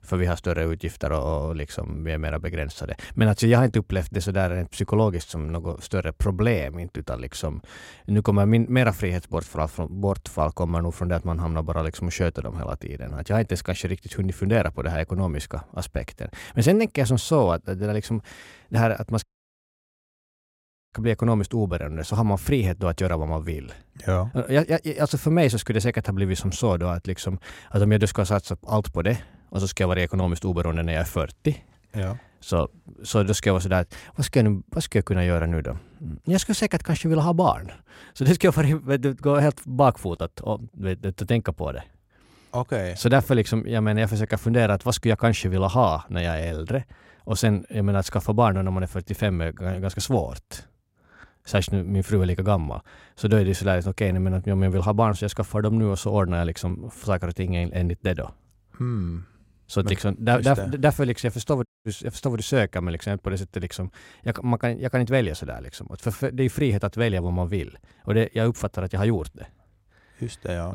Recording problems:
audio cutting out; at 19 s for 1.5 s and at 1:02
abrupt cut into speech; at the end

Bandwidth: 16 kHz